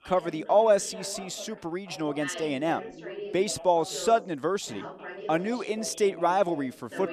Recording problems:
background chatter; noticeable; throughout; 2 voices, 15 dB below the speech

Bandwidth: 14.5 kHz